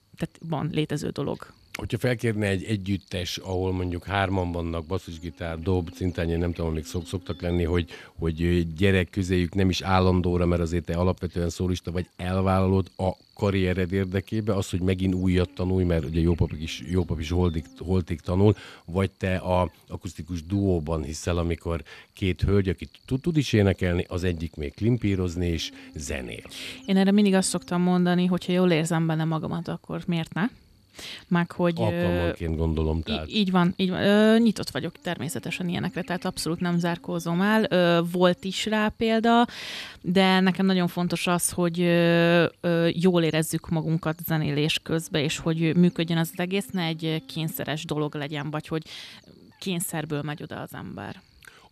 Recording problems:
electrical hum; faint; throughout; 60 Hz, 25 dB below the speech

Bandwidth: 14 kHz